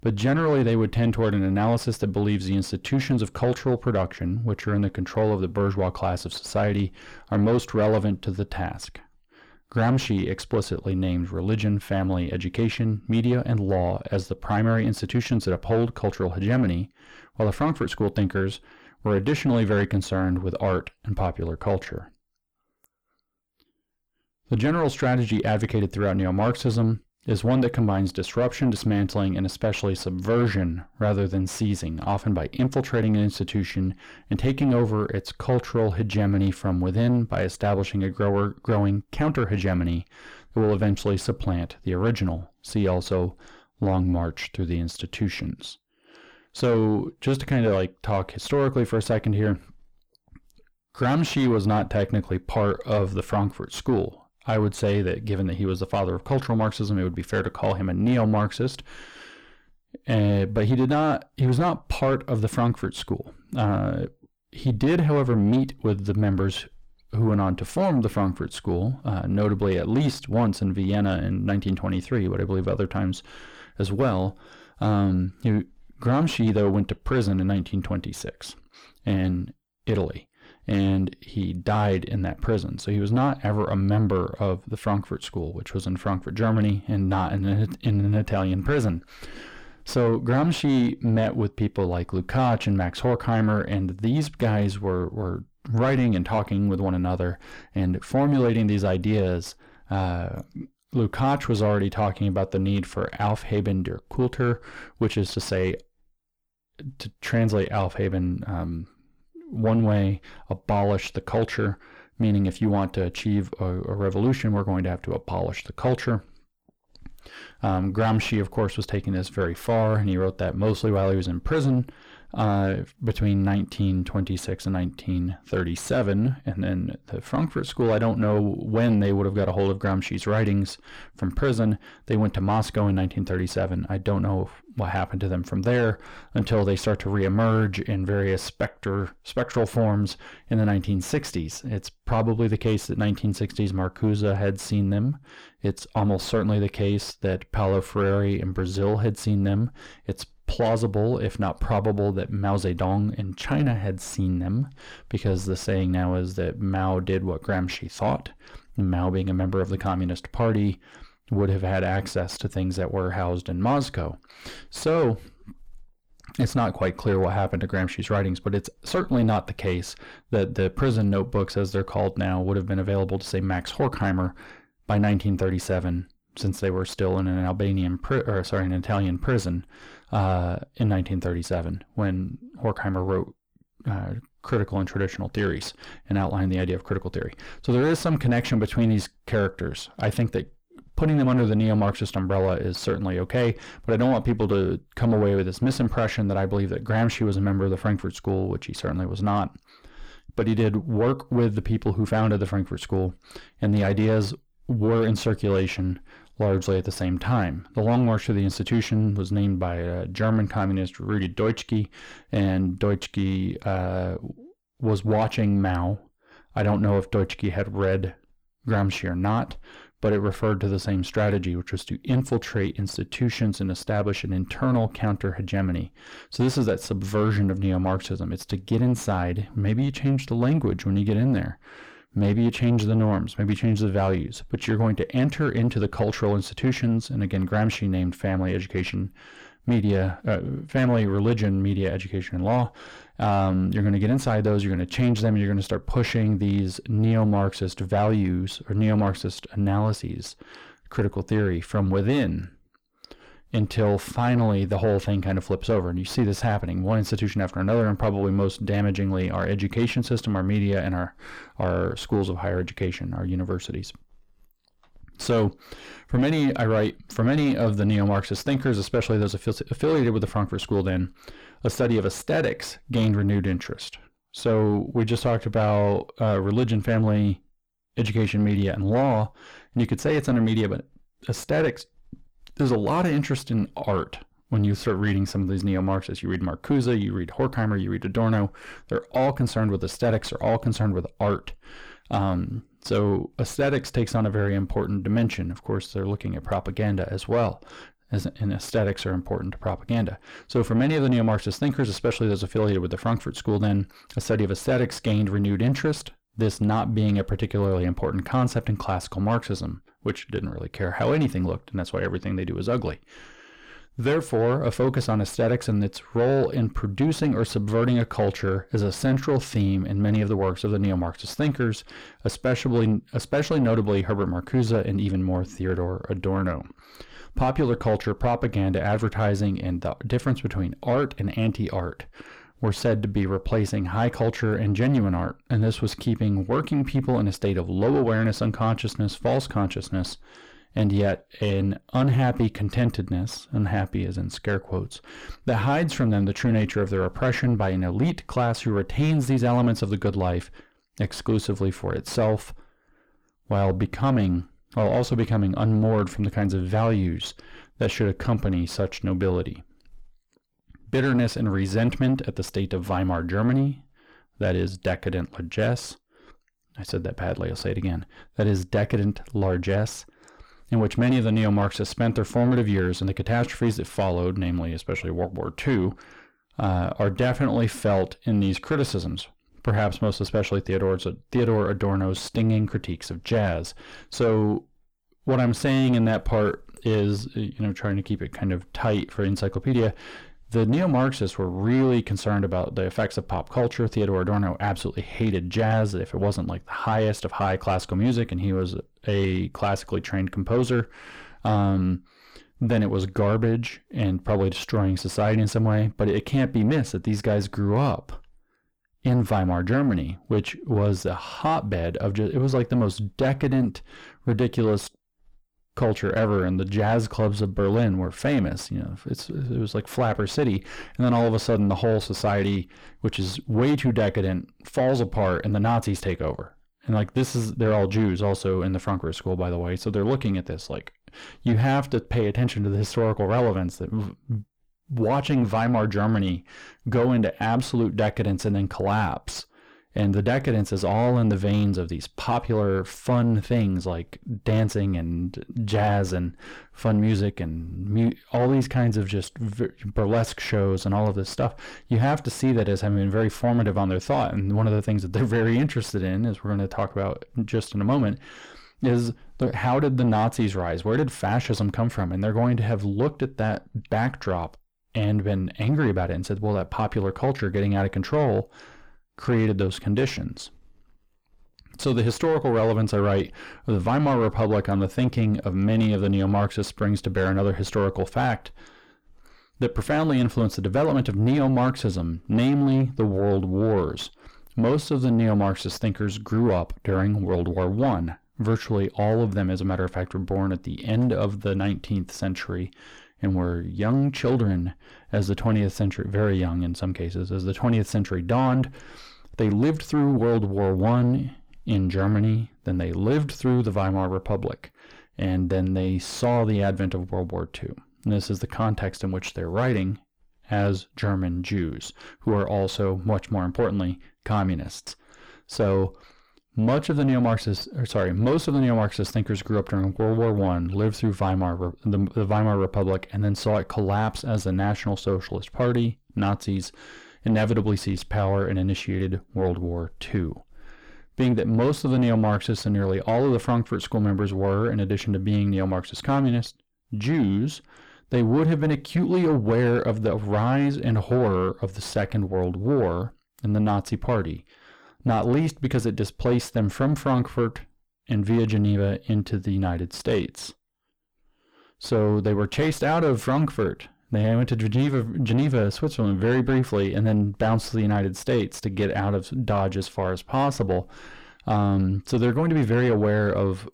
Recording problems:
distortion; slight; 10 dB below the speech

